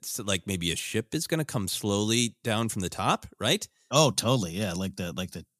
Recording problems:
none

